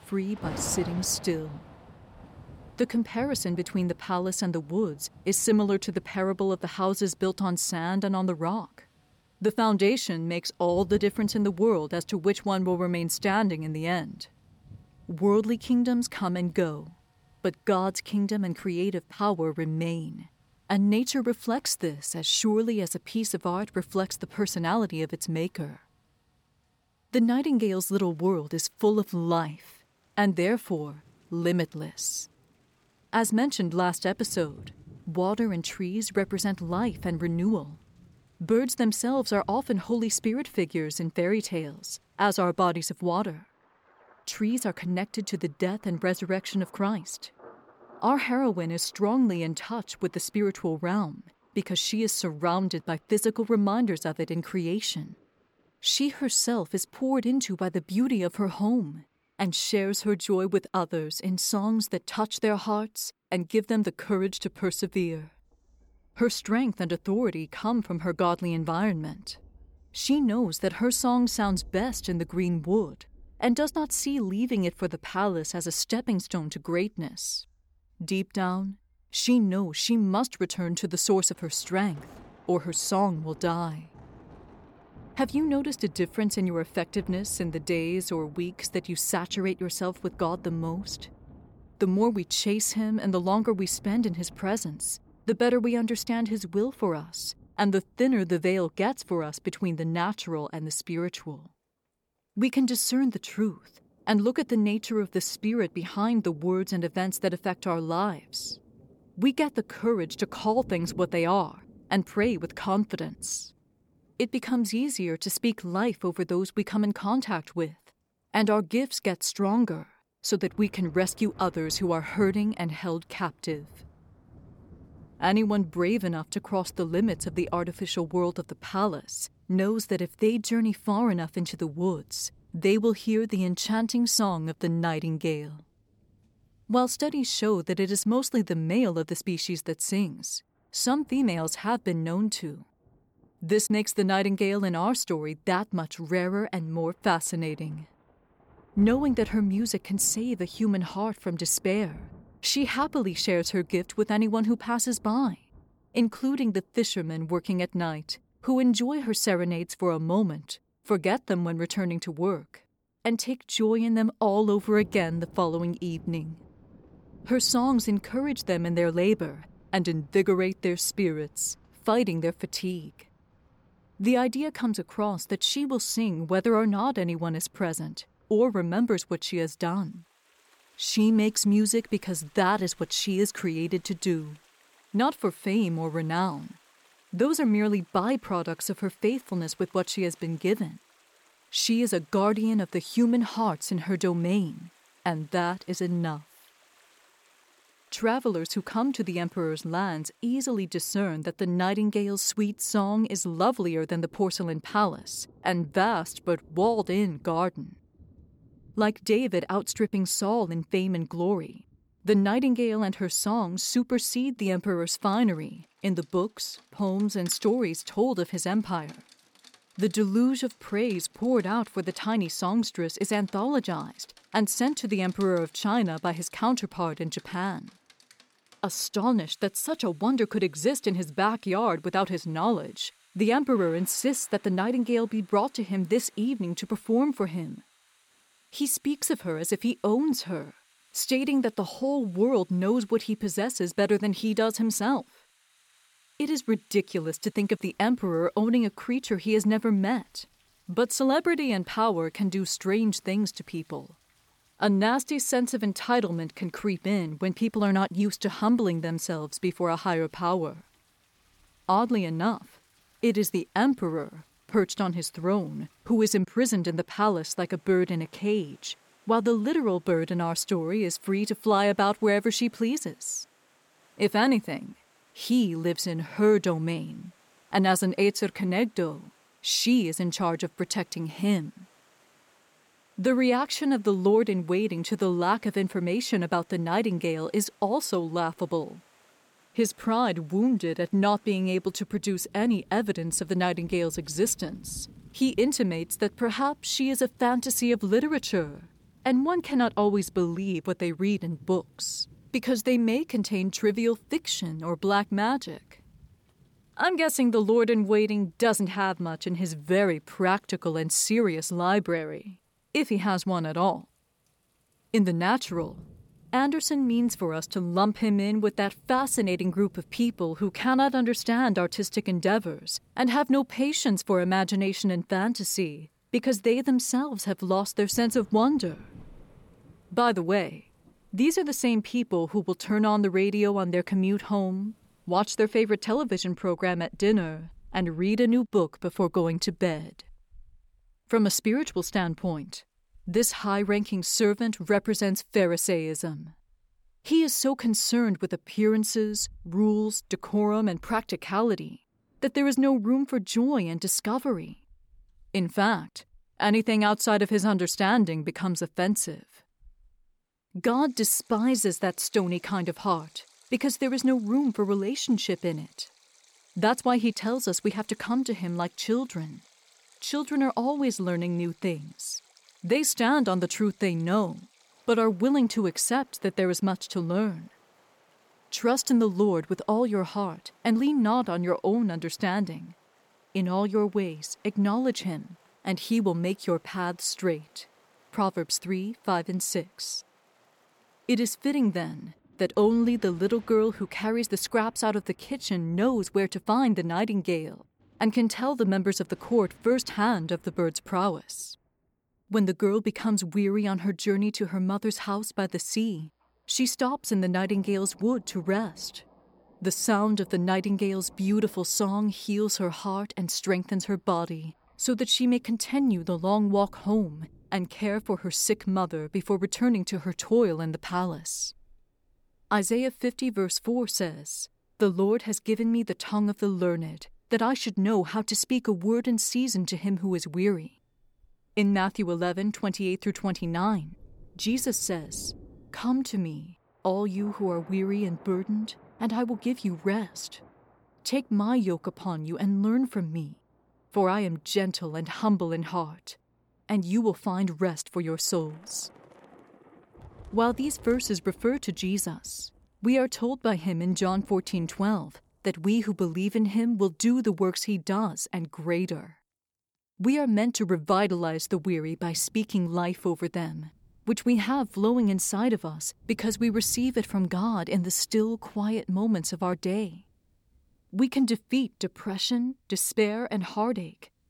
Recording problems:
rain or running water; faint; throughout; 30 dB below the speech

